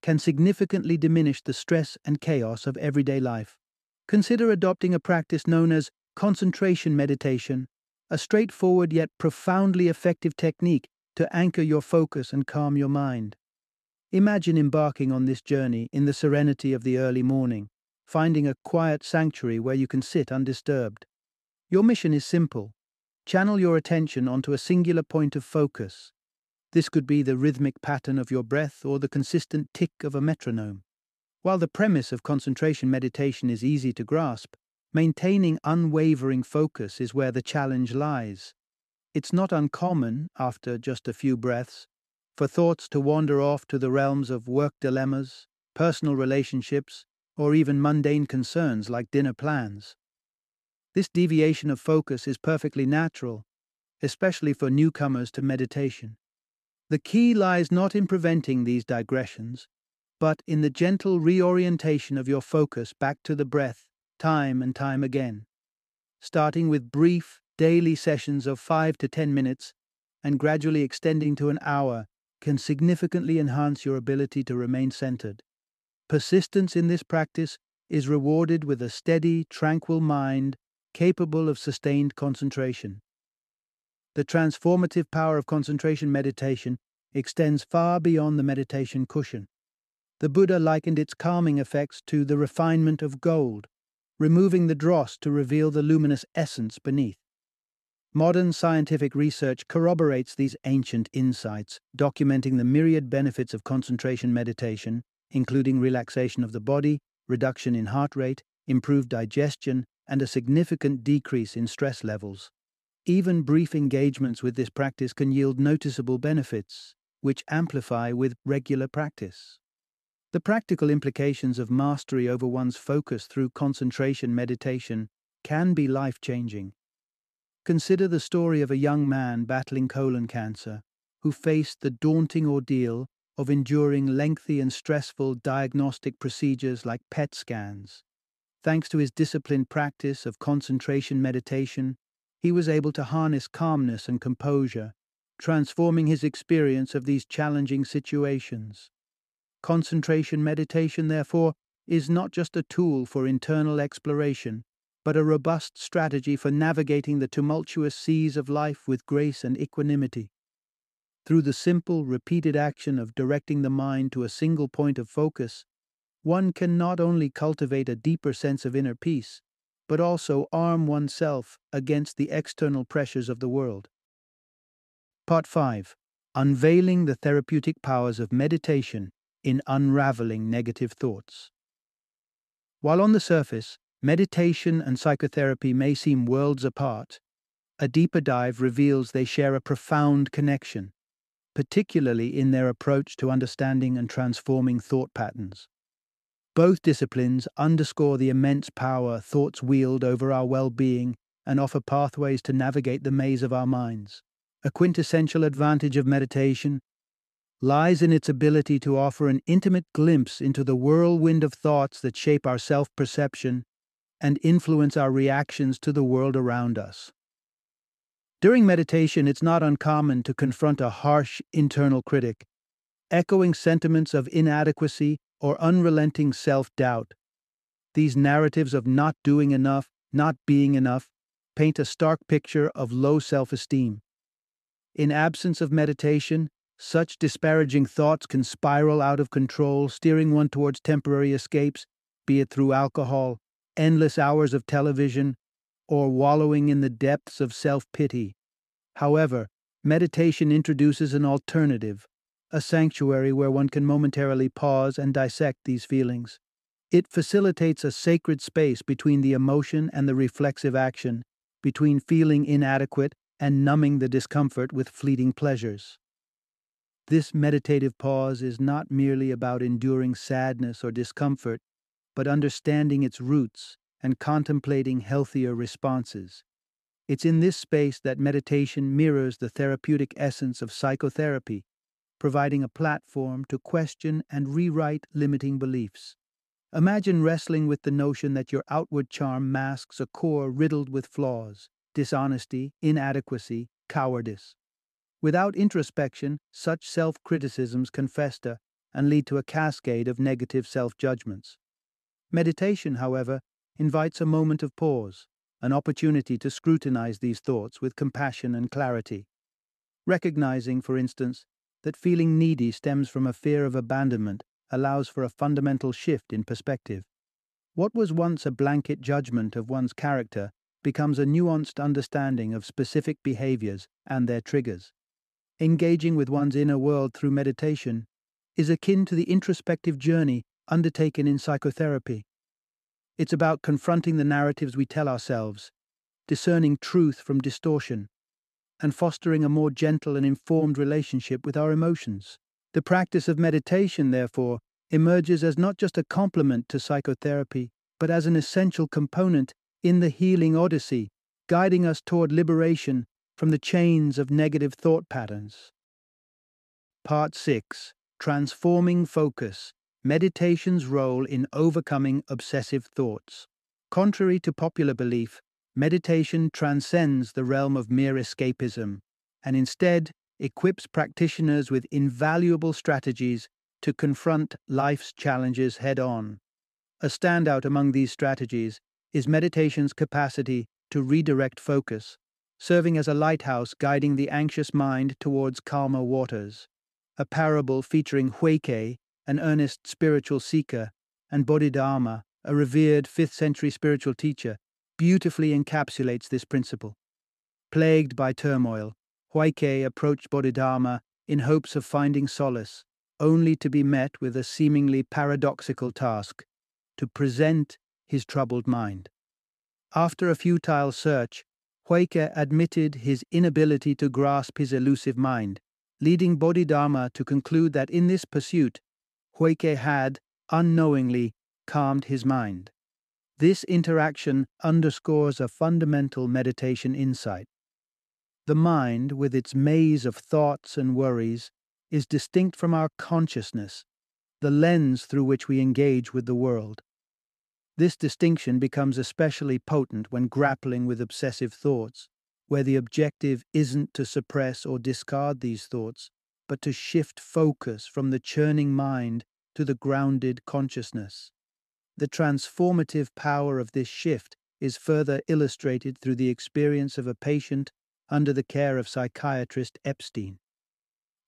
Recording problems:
none

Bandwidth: 13.5 kHz